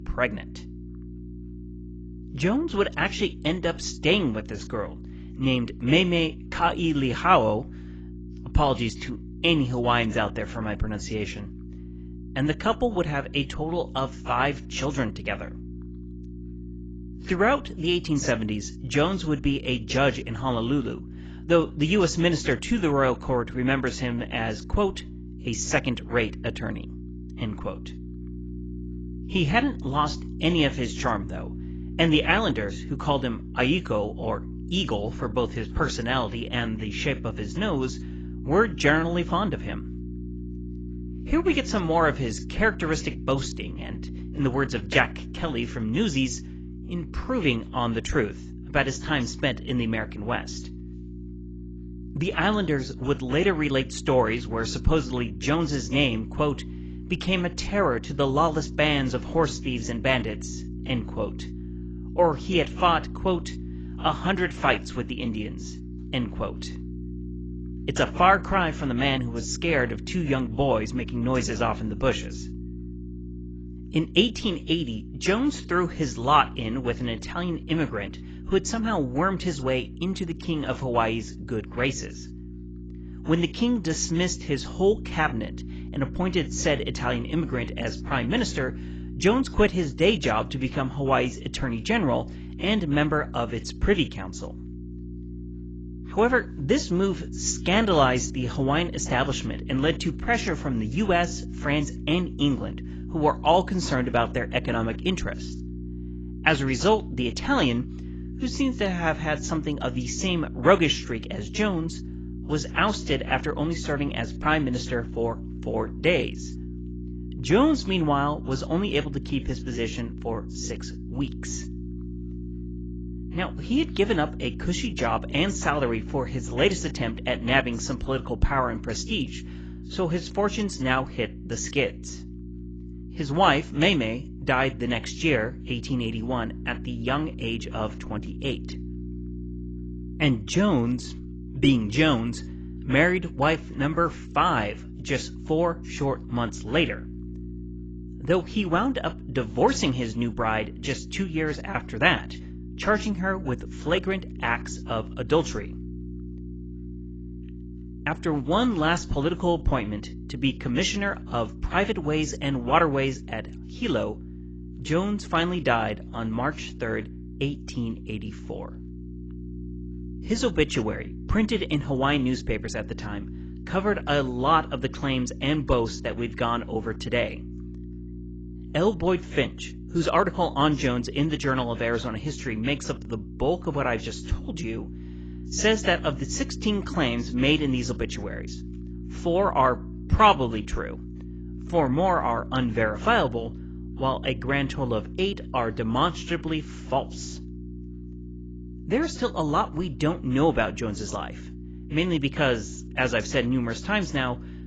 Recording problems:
garbled, watery; badly; nothing above 7.5 kHz
electrical hum; noticeable; throughout; 60 Hz, 20 dB below the speech

